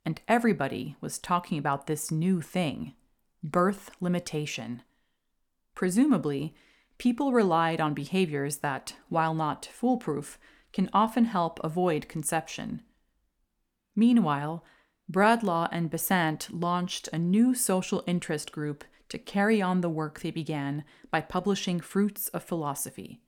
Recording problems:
none

